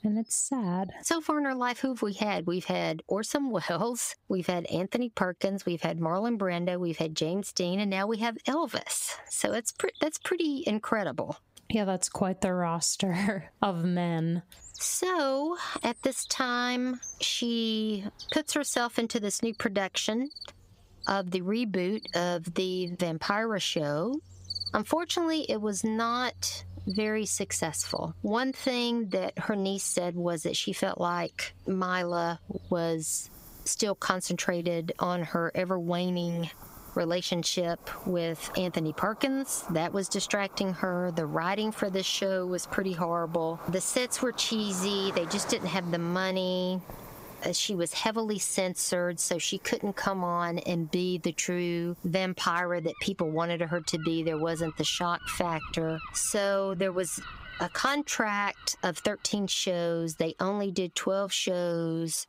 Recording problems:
squashed, flat; somewhat, background pumping
animal sounds; noticeable; throughout; 15 dB below the speech

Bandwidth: 15.5 kHz